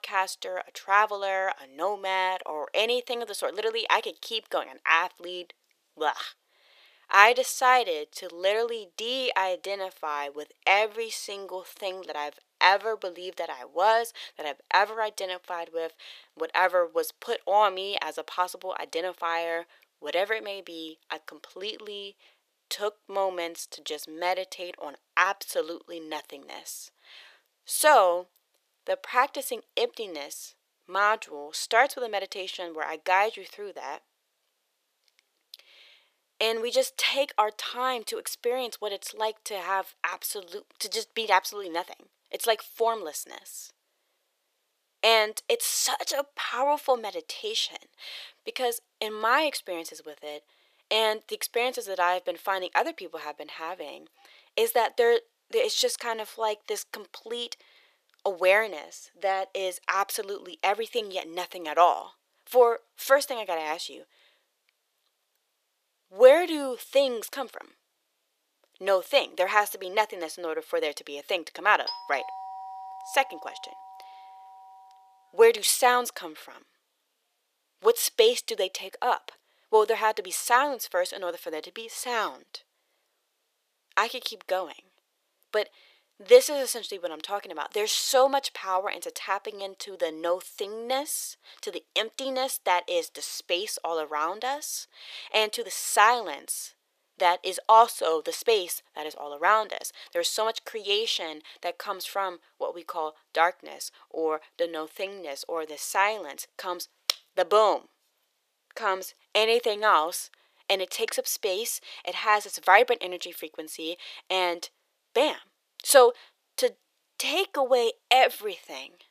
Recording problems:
thin; very; fading below 500 Hz
doorbell; noticeable; from 1:12 to 1:14; peak 8 dB below the speech

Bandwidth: 14.5 kHz